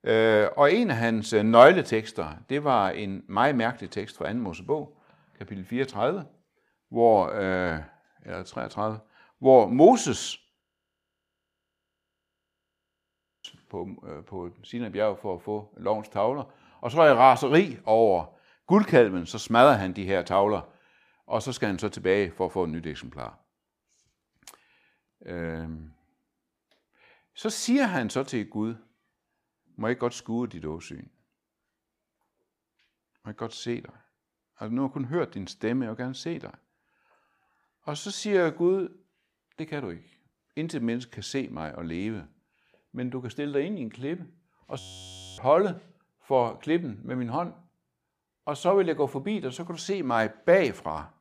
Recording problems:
audio freezing; at 11 s for 3 s and at 45 s for 0.5 s

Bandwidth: 15 kHz